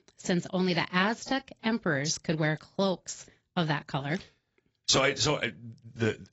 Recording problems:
garbled, watery; badly; nothing above 7.5 kHz

